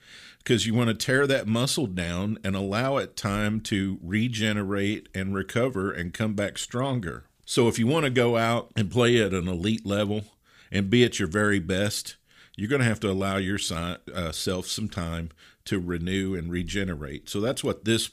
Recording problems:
none

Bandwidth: 15 kHz